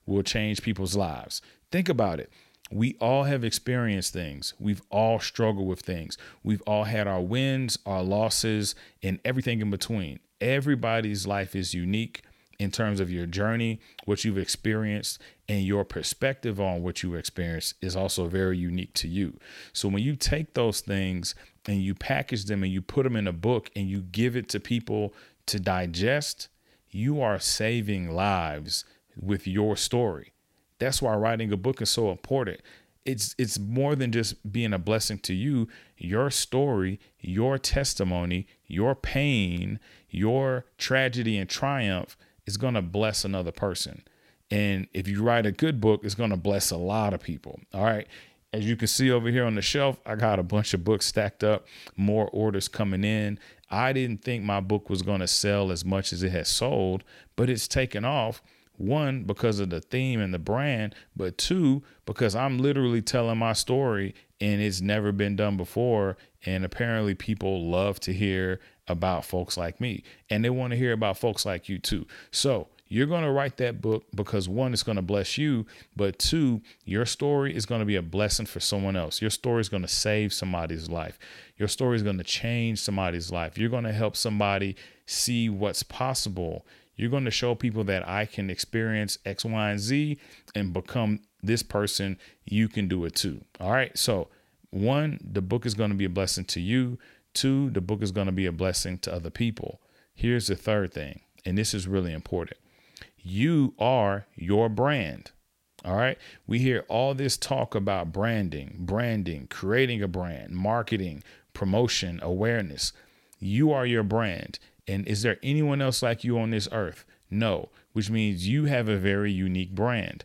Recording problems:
uneven, jittery; slightly; from 9 to 50 s

